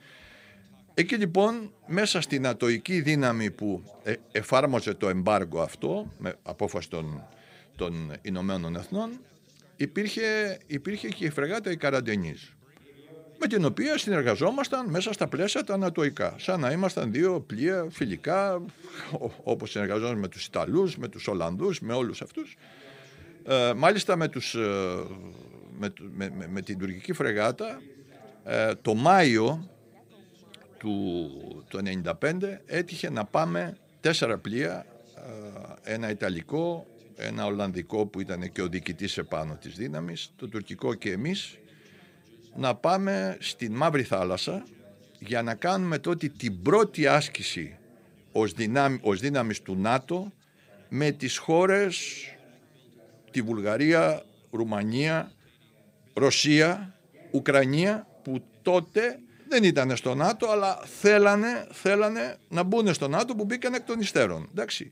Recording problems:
background chatter; faint; throughout; 3 voices, 30 dB below the speech

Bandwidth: 15.5 kHz